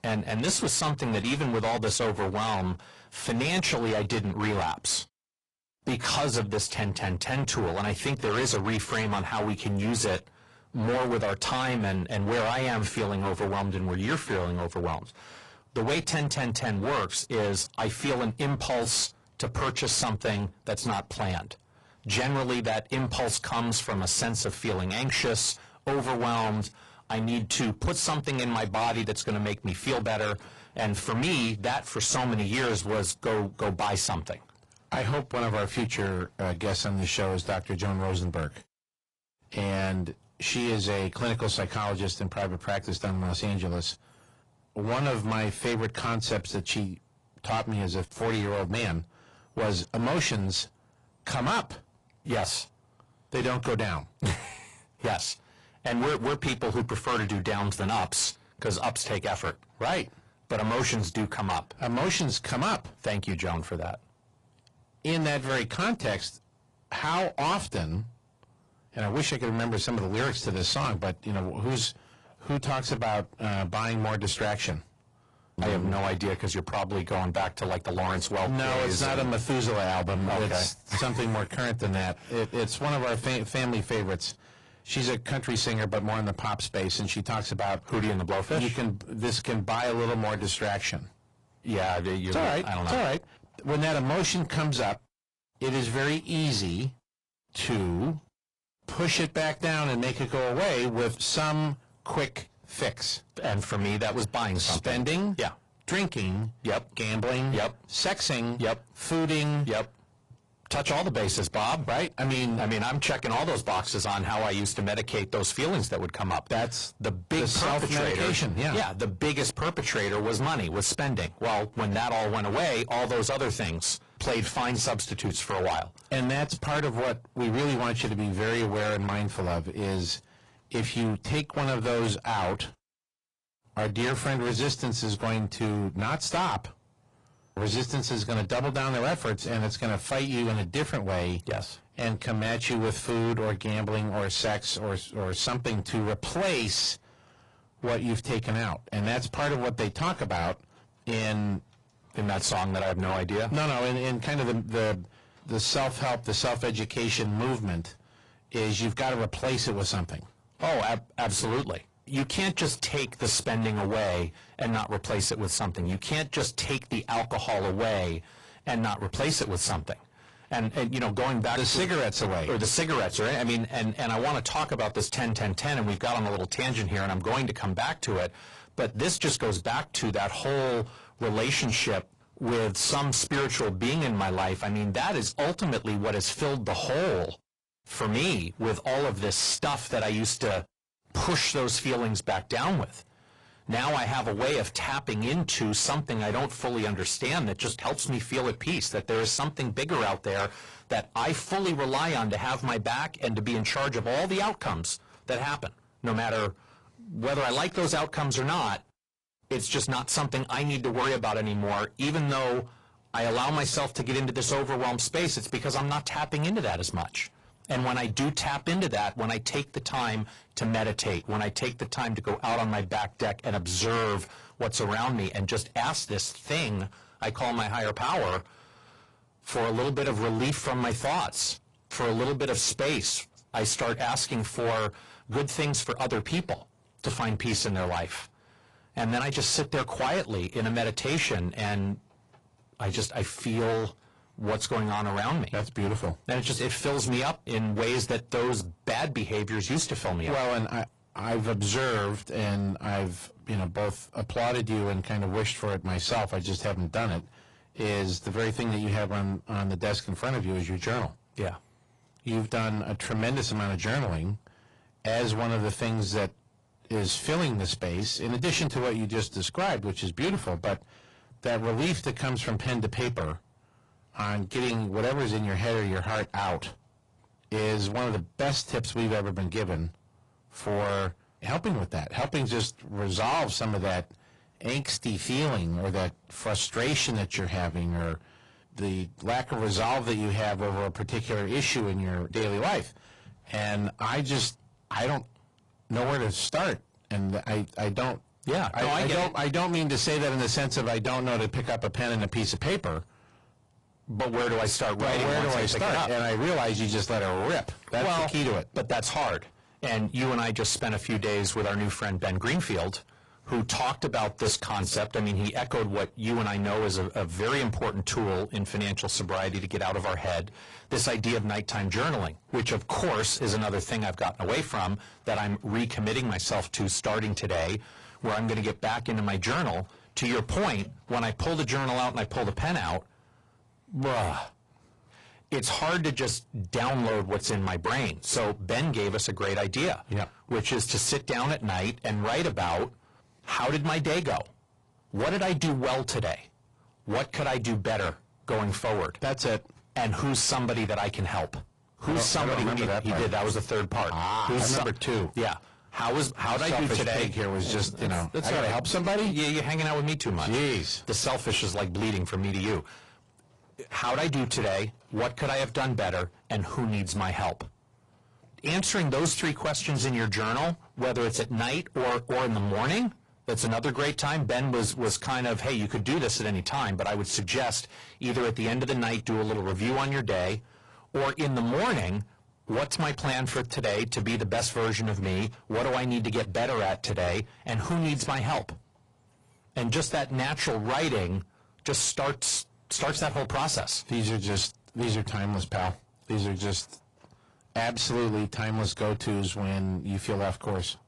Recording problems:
distortion; heavy; 18% of the sound clipped
garbled, watery; slightly; nothing above 10.5 kHz

